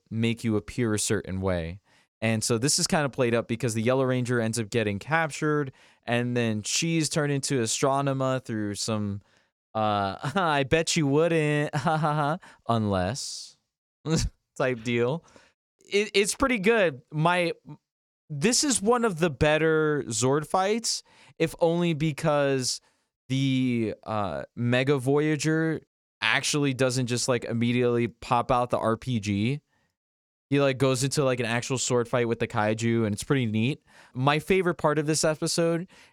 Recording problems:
none

